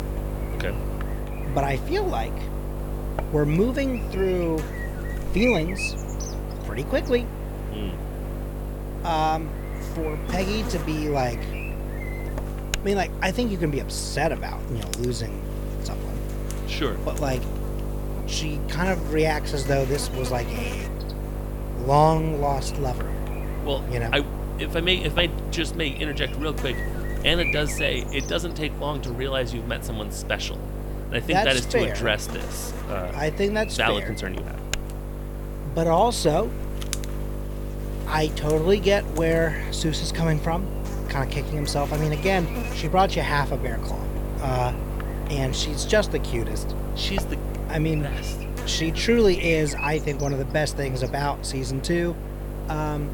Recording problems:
electrical hum; loud; throughout; 50 Hz, 10 dB below the speech

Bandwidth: 18.5 kHz